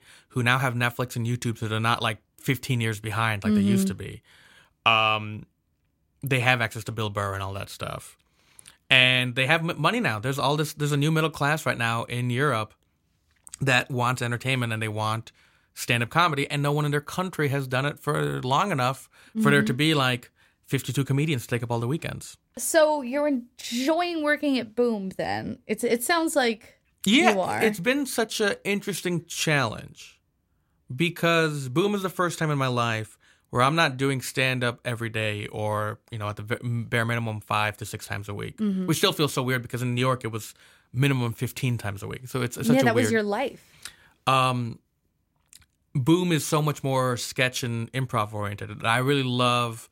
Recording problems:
none

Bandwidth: 16 kHz